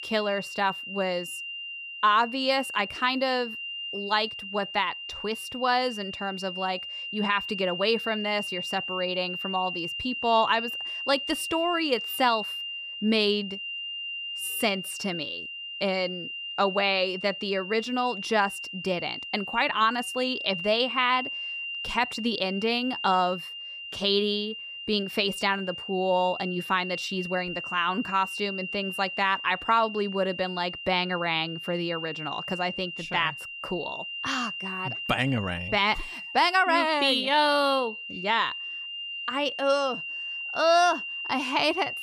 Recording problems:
high-pitched whine; loud; throughout; 3 kHz, 7 dB below the speech

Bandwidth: 15 kHz